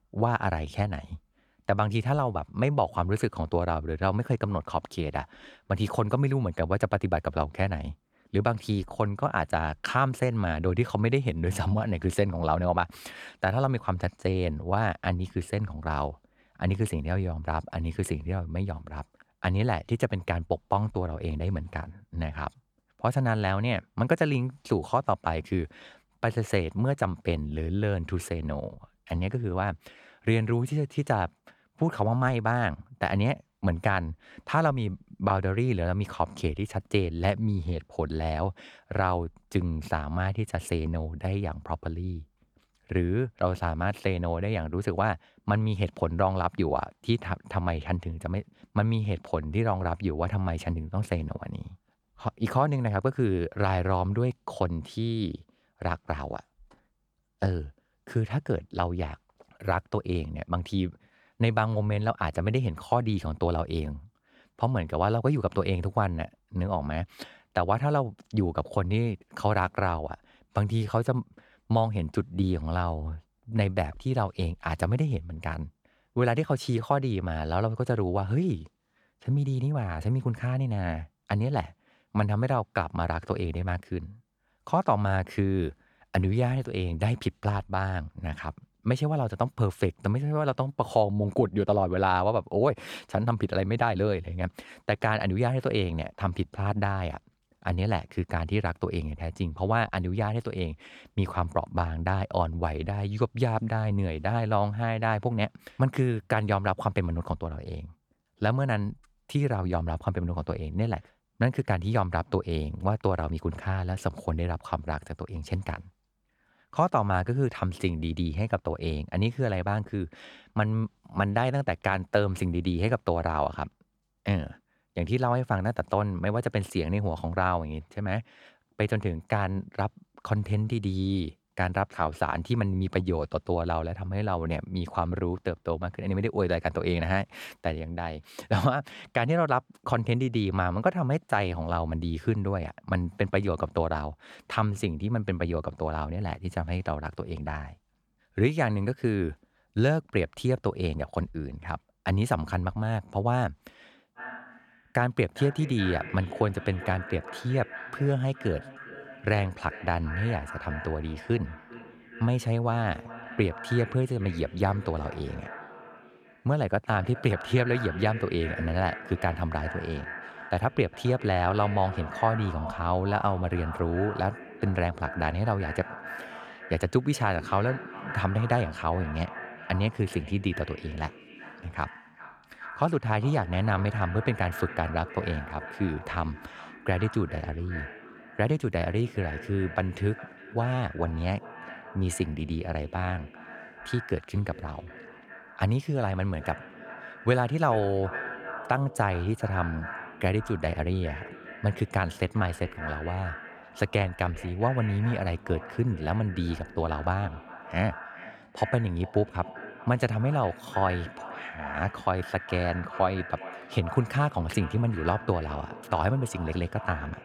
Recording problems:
echo of what is said; noticeable; from 2:34 on; 410 ms later, 15 dB below the speech

